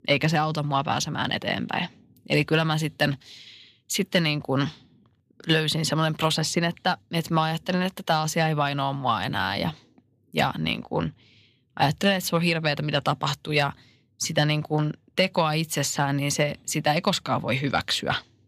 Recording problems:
none

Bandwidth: 14.5 kHz